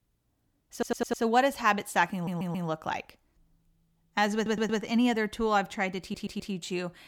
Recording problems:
audio stuttering; 4 times, first at 0.5 s

